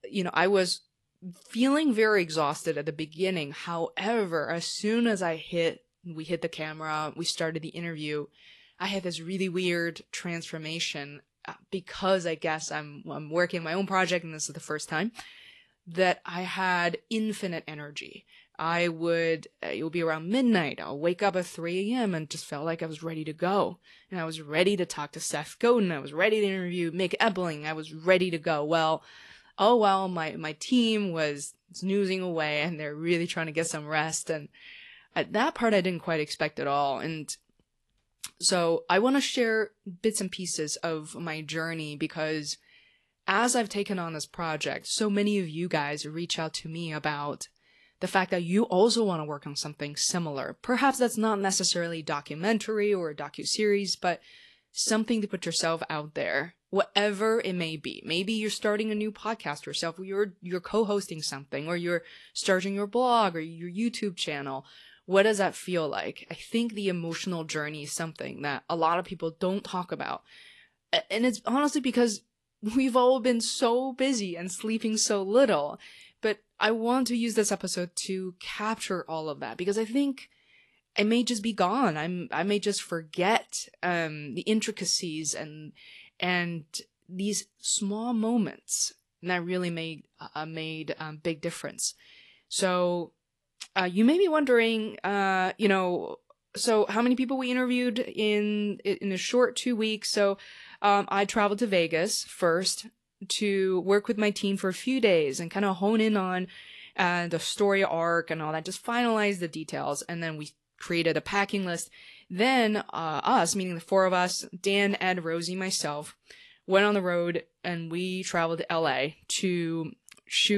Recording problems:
garbled, watery; slightly; nothing above 11.5 kHz
abrupt cut into speech; at the end

